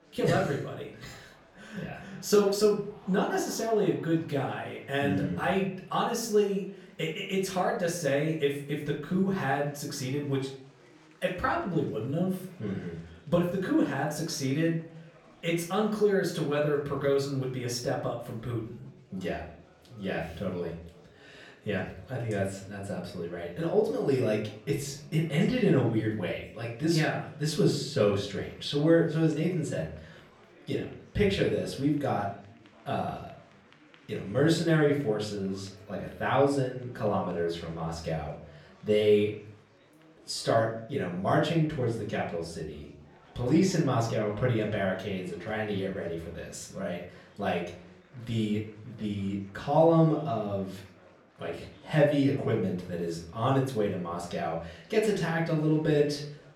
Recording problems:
off-mic speech; far
room echo; slight; dies away in 0.5 s
chatter from many people; faint; throughout; 25 dB below the speech

